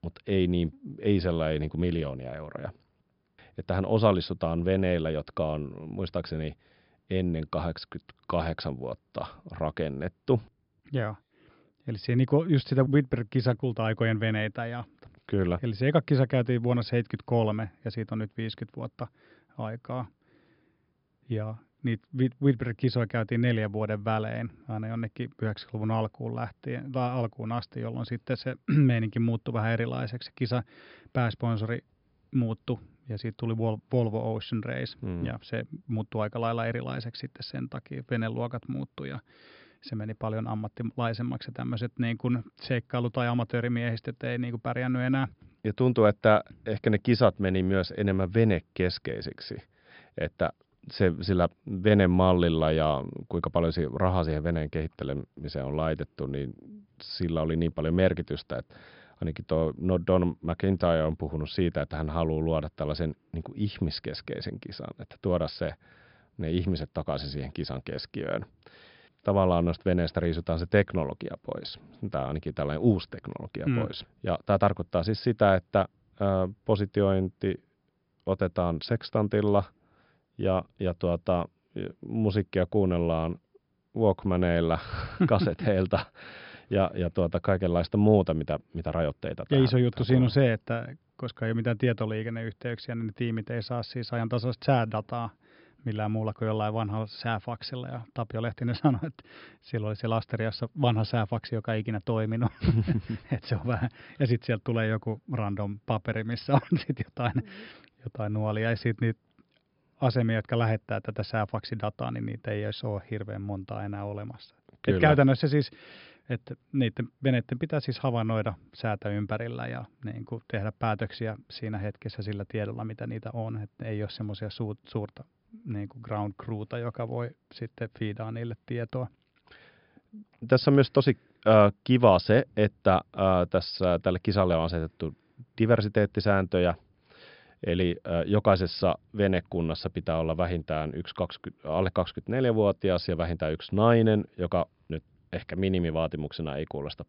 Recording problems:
high frequencies cut off; noticeable; nothing above 5.5 kHz

